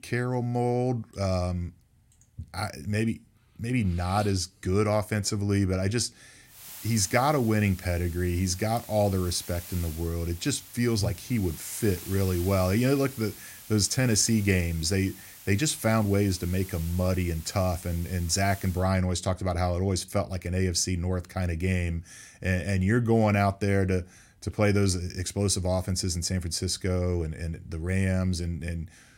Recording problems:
hiss; noticeable; from 6.5 to 19 s; 15 dB below the speech

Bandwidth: 16 kHz